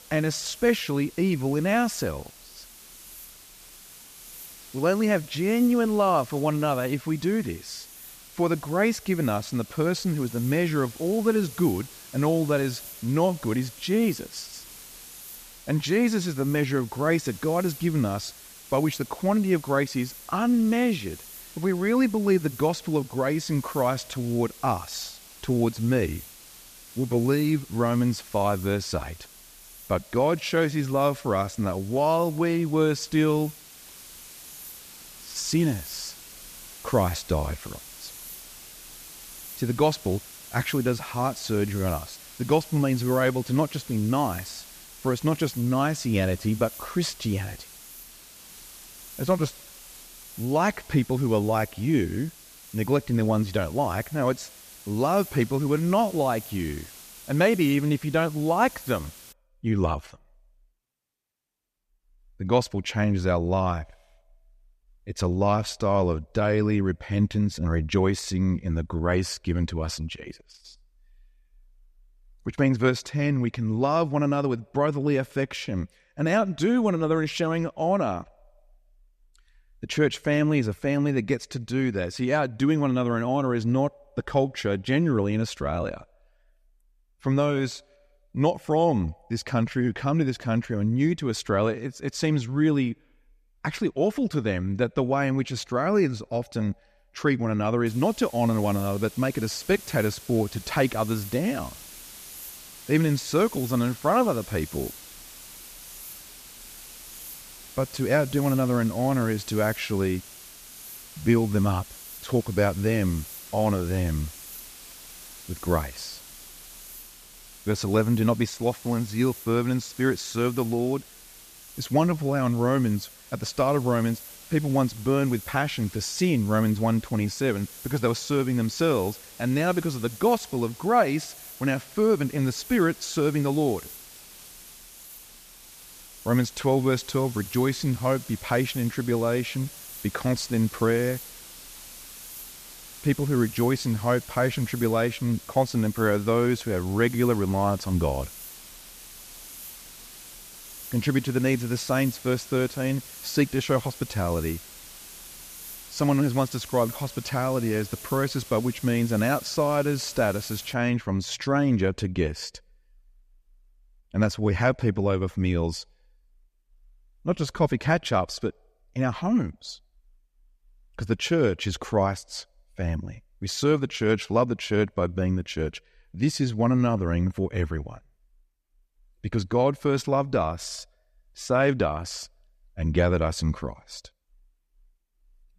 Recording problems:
hiss; noticeable; until 59 s and from 1:38 to 2:41; 15 dB below the speech

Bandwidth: 14.5 kHz